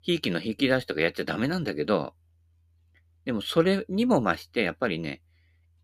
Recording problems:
none

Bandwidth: 14.5 kHz